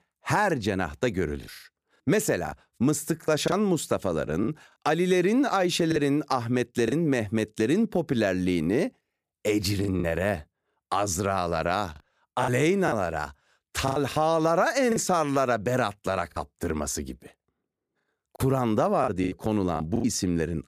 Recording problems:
choppy; very; 6% of the speech affected

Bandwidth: 15 kHz